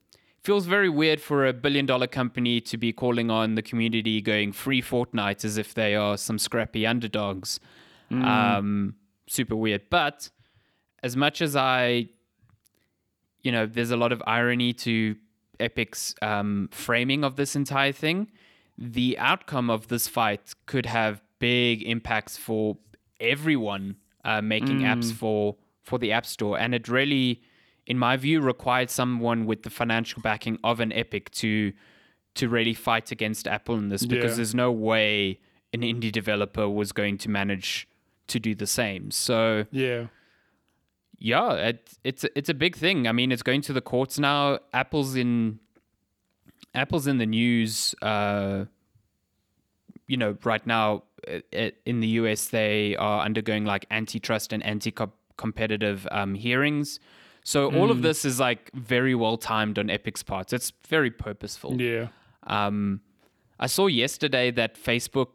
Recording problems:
none

